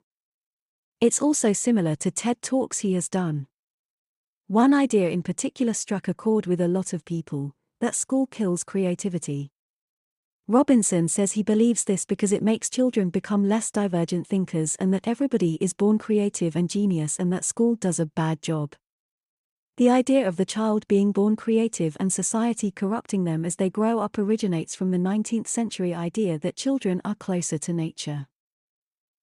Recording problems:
none

